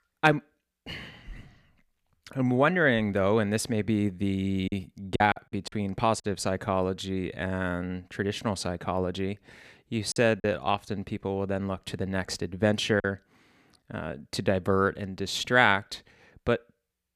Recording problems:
choppy; very; from 4.5 to 6 s and at 10 s; 8% of the speech affected

